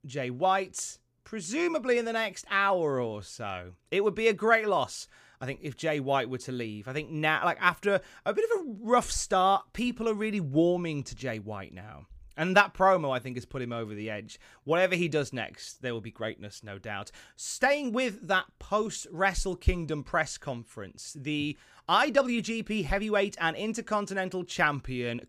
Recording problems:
none

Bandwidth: 15 kHz